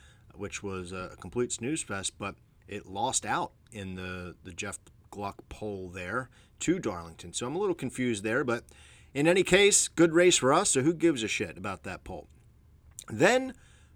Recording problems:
none

